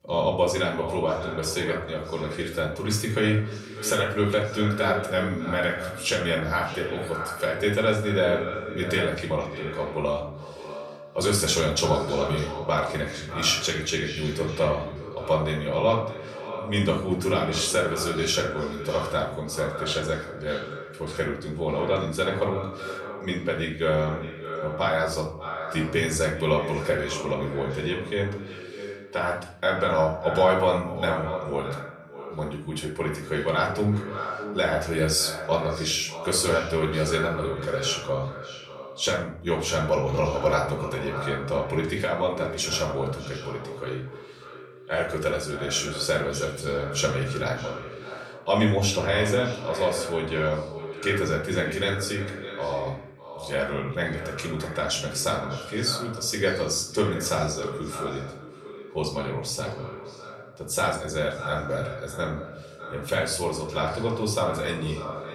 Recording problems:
echo of what is said; strong; throughout; 600 ms later, 10 dB below the speech
off-mic speech; far
room echo; slight; dies away in 0.5 s

